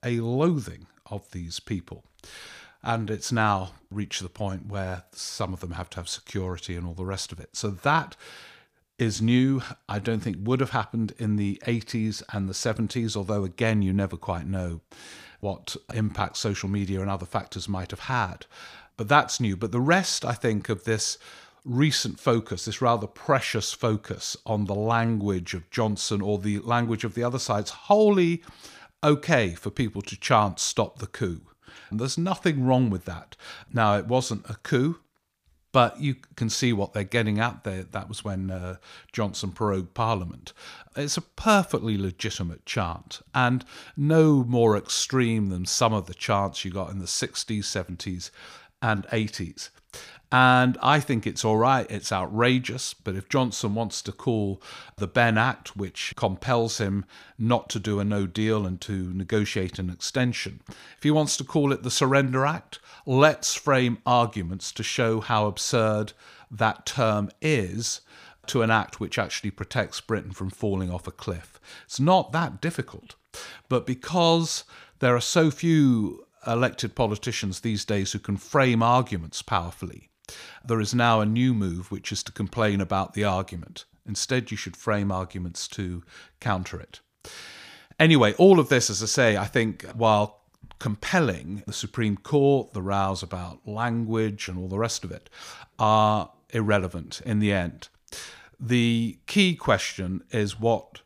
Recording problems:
none

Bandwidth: 15 kHz